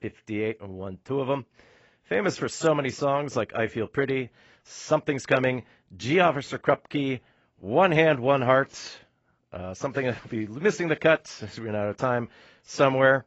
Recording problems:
garbled, watery; badly; nothing above 8 kHz

